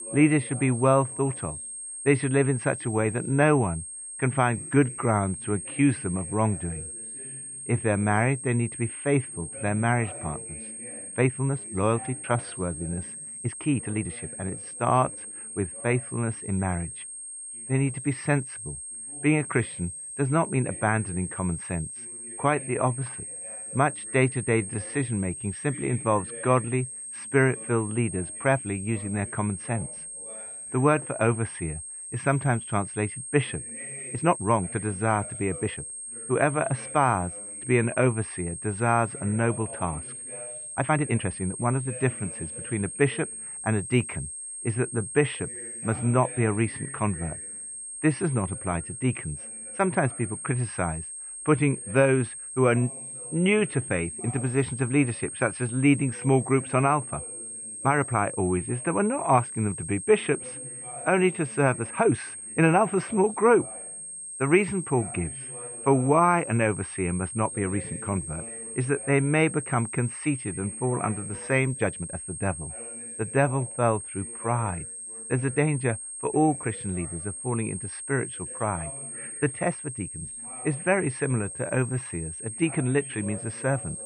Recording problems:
muffled; very; fading above 2.5 kHz
high-pitched whine; loud; throughout; 8.5 kHz, 9 dB below the speech
voice in the background; faint; throughout; 20 dB below the speech
uneven, jittery; strongly; from 4.5 s to 1:22

